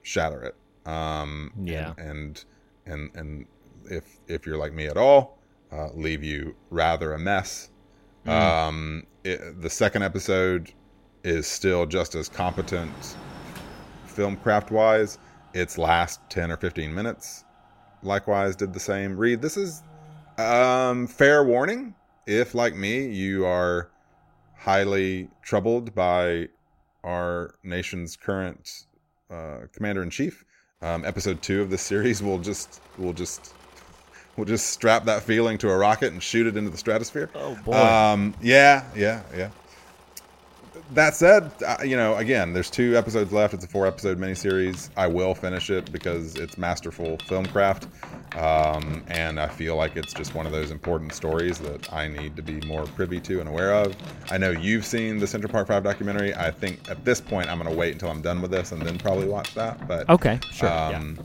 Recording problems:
machinery noise; noticeable; throughout; 20 dB below the speech

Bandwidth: 16 kHz